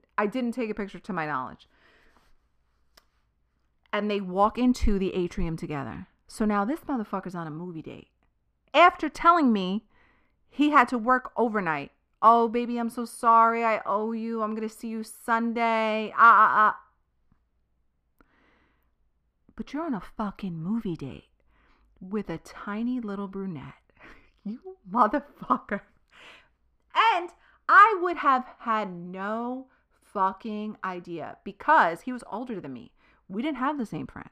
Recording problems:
muffled; slightly; fading above 4 kHz

